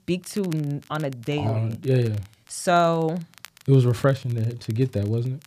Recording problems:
crackle, like an old record; faint; 25 dB below the speech

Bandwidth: 14.5 kHz